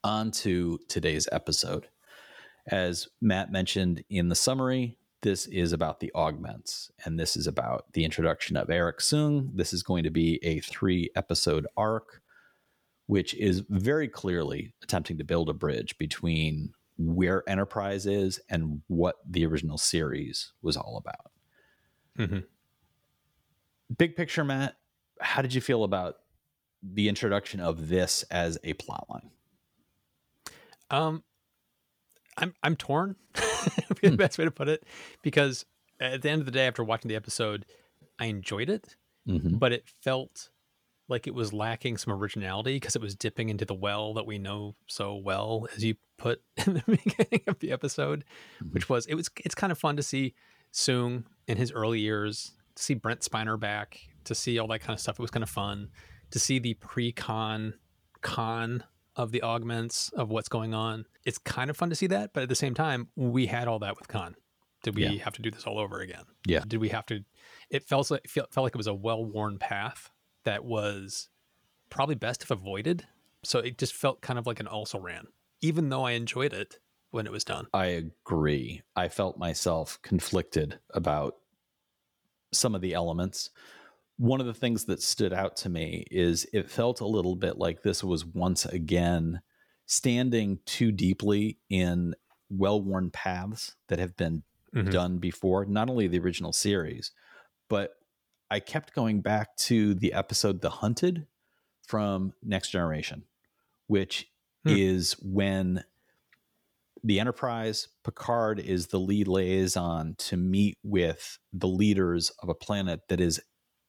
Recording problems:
none

